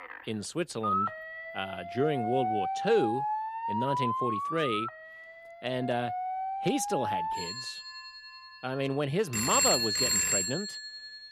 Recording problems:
alarms or sirens; very loud; throughout; 2 dB above the speech

